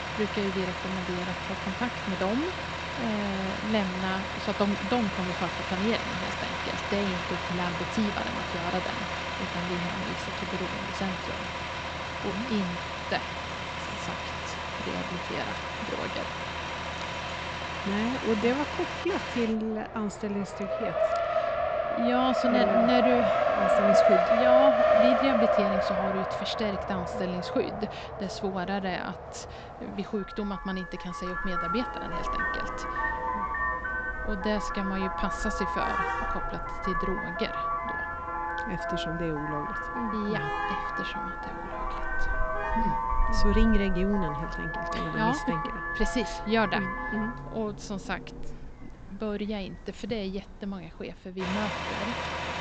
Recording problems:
high frequencies cut off; noticeable; nothing above 8 kHz
traffic noise; very loud; throughout; 2 dB above the speech

